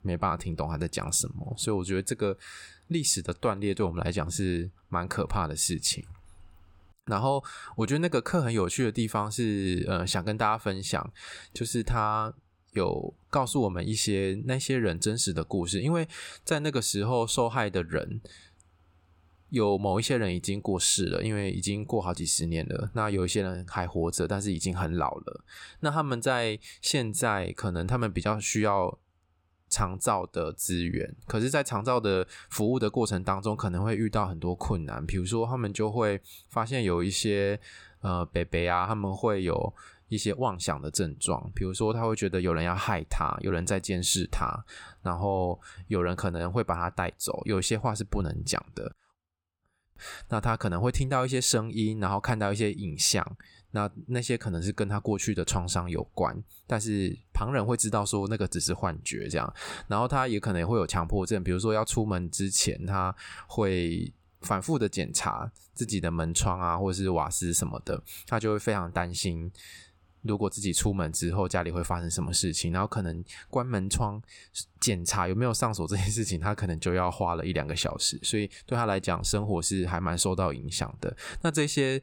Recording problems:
none

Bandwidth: 18 kHz